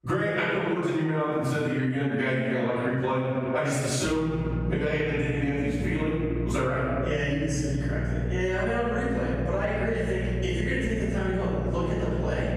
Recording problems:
room echo; strong; dies away in 1.4 s
off-mic speech; far
squashed, flat; somewhat
electrical hum; noticeable; from 4 s on; 60 Hz, 15 dB below the speech

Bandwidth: 15 kHz